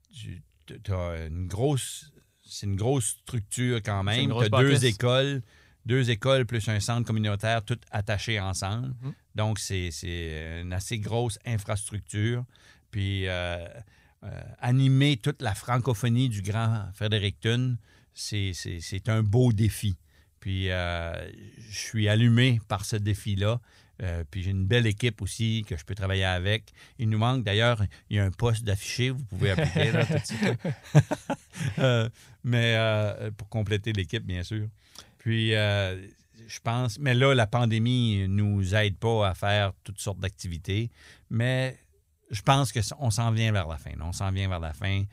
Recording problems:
none

